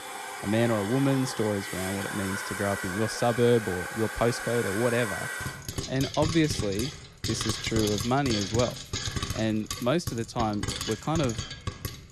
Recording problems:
household noises; loud; throughout; 5 dB below the speech

